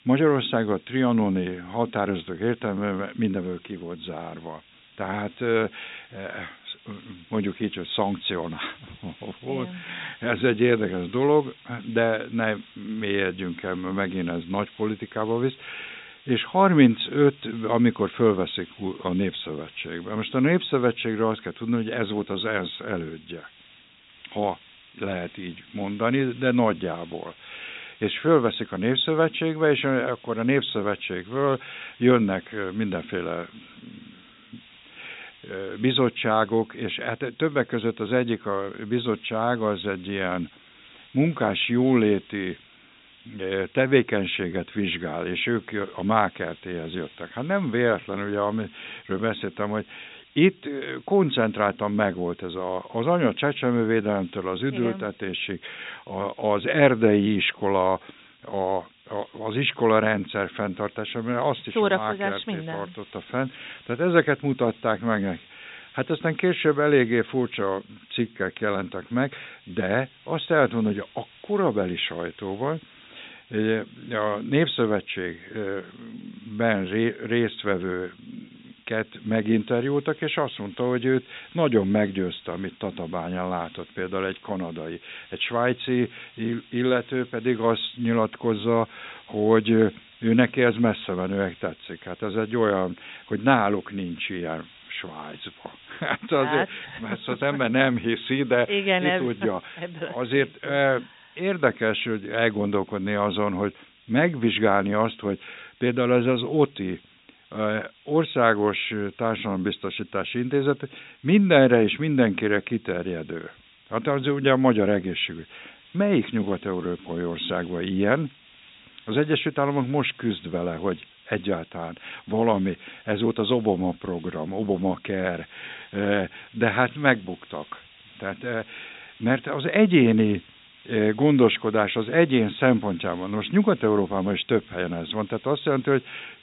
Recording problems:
high frequencies cut off; severe; nothing above 4 kHz
hiss; faint; throughout; 25 dB below the speech

